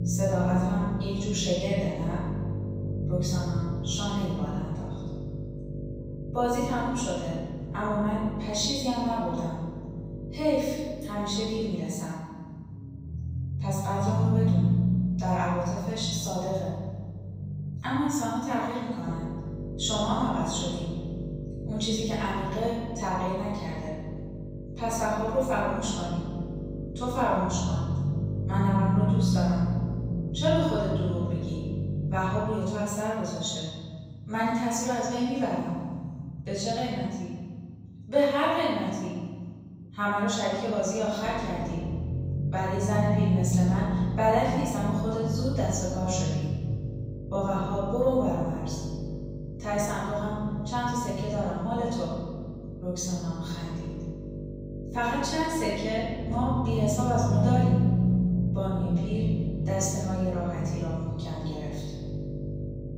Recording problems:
room echo; strong; dies away in 1.6 s
off-mic speech; far
electrical hum; noticeable; until 12 s, from 19 to 33 s and from 41 s on; 50 Hz, 15 dB below the speech
low rumble; noticeable; throughout; 10 dB below the speech

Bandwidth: 15.5 kHz